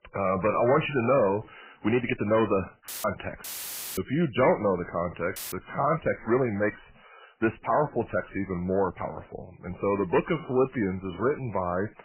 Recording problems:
garbled, watery; badly; nothing above 3 kHz
distortion; slight; 10 dB below the speech
uneven, jittery; strongly; from 1.5 to 11 s
audio cutting out; filled with static; at 3 s, at 3.5 s for 0.5 s and at 5.5 s

